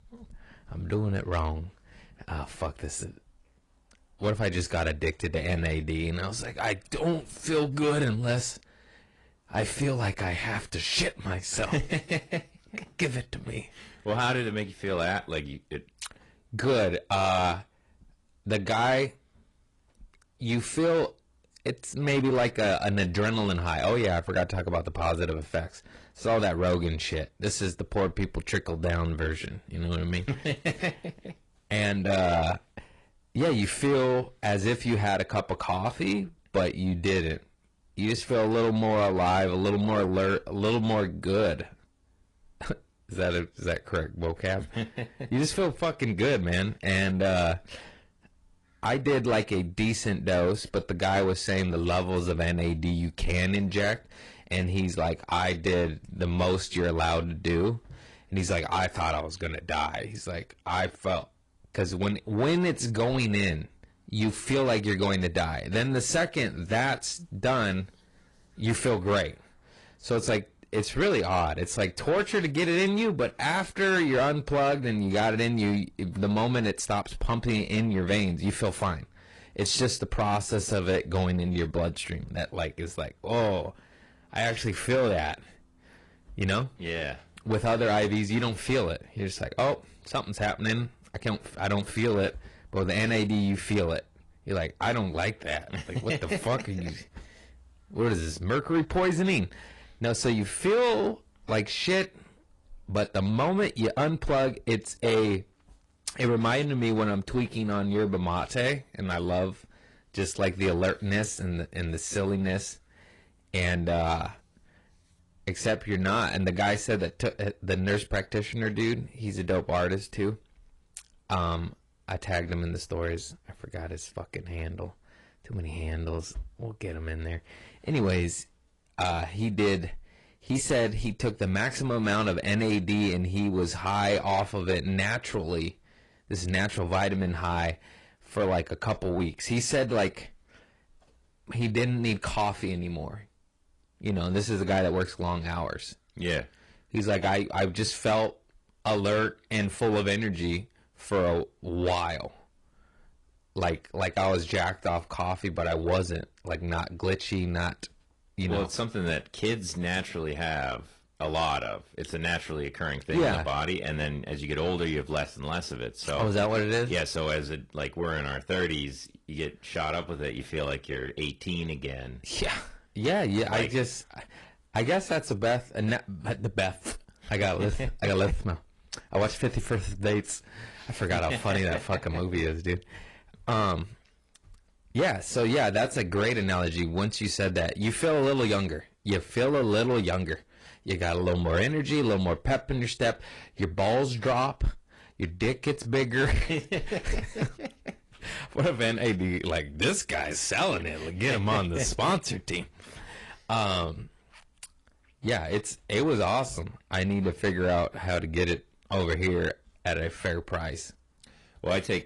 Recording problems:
distortion; slight; 10 dB below the speech
garbled, watery; slightly; nothing above 10 kHz

